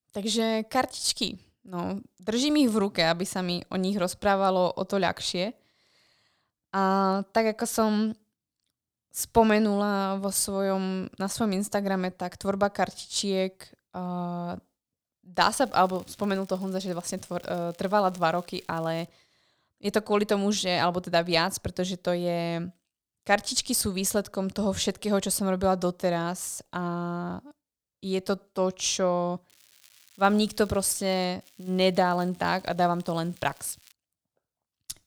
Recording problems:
crackling; faint; from 16 to 19 s, from 30 to 31 s and from 31 to 34 s; 30 dB below the speech

